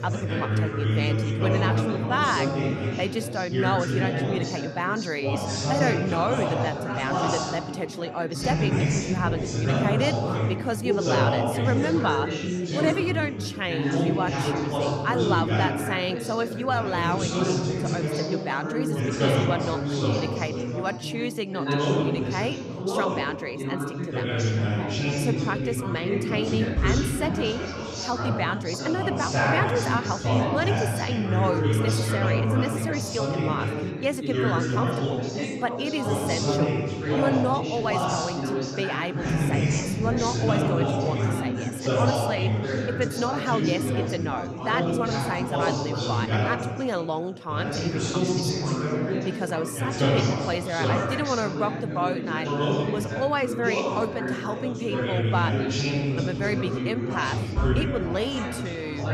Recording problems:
chatter from many people; very loud; throughout; 3 dB above the speech

